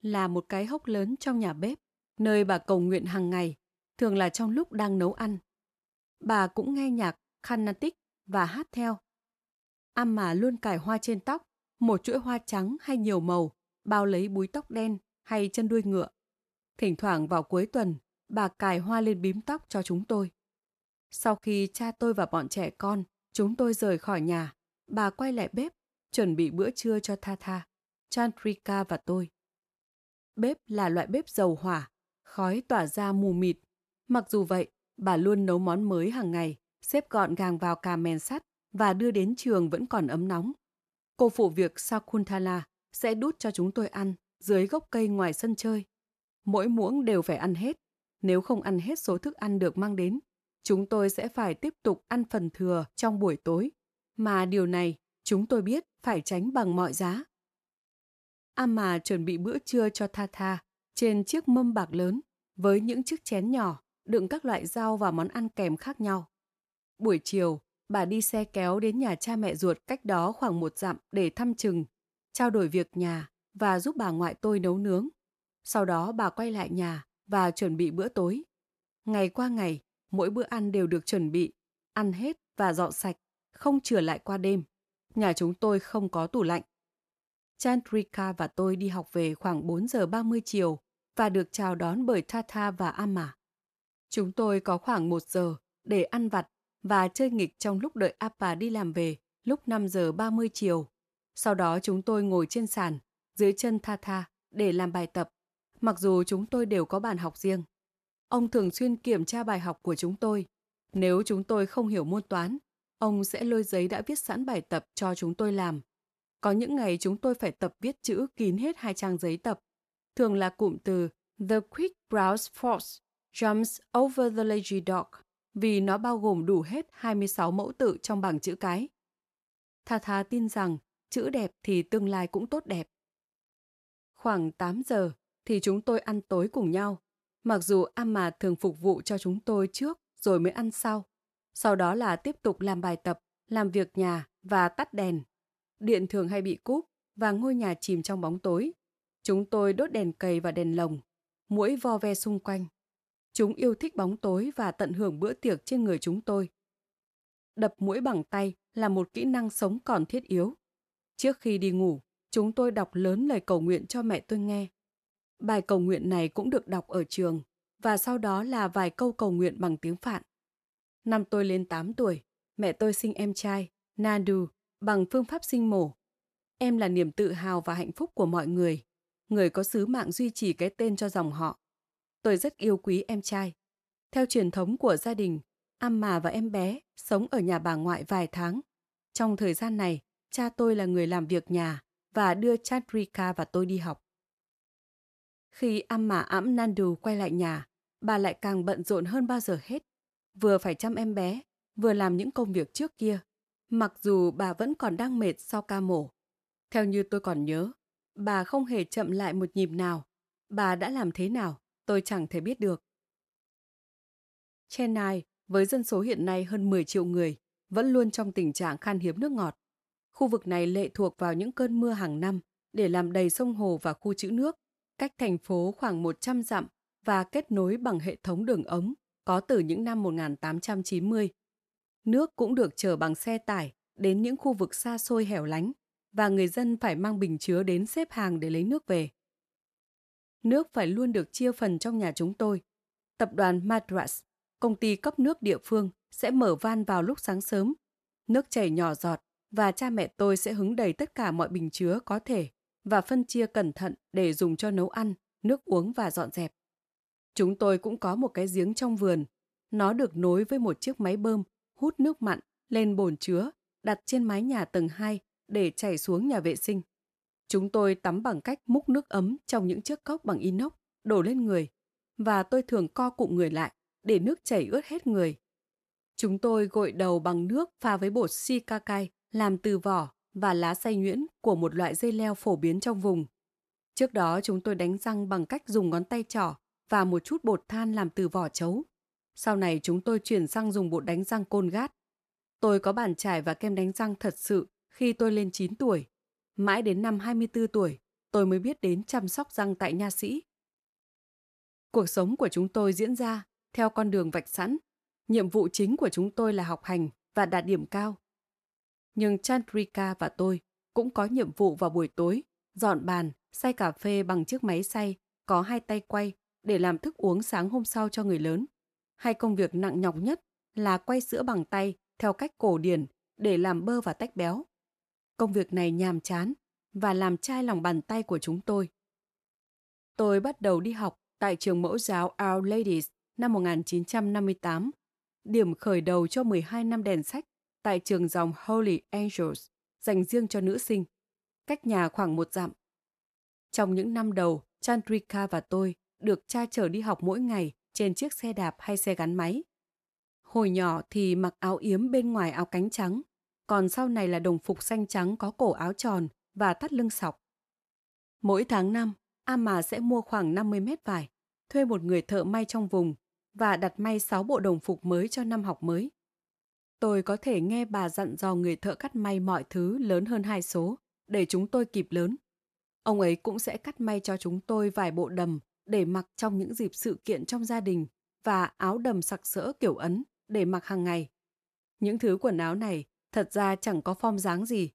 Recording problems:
none

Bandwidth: 14 kHz